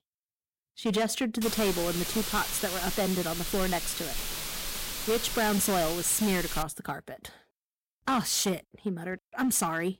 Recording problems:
distortion; slight; 7% of the sound clipped
hiss; loud; from 1.5 to 6.5 s; 4 dB below the speech

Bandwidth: 16 kHz